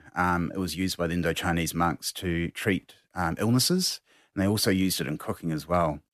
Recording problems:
none

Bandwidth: 14 kHz